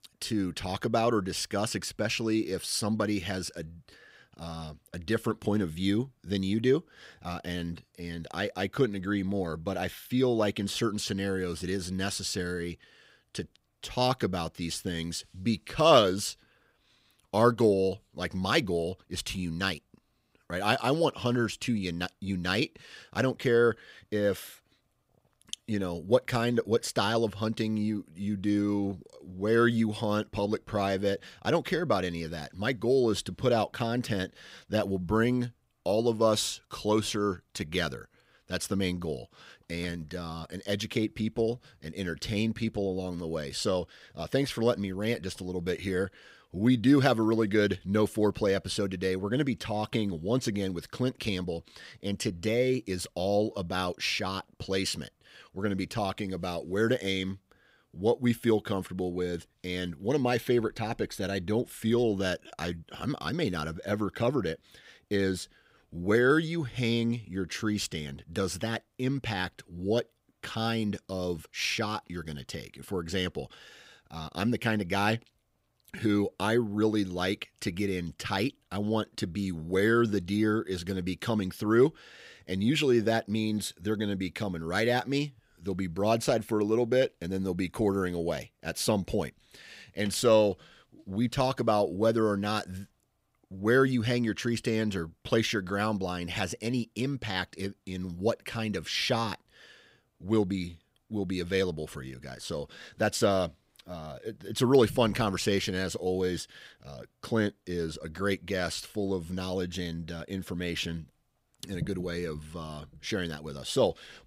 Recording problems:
none

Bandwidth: 15.5 kHz